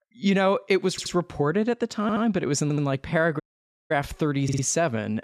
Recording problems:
audio stuttering; 4 times, first at 1 s
audio cutting out; at 3.5 s for 0.5 s

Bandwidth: 14 kHz